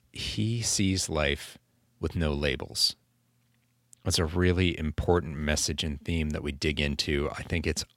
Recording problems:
none

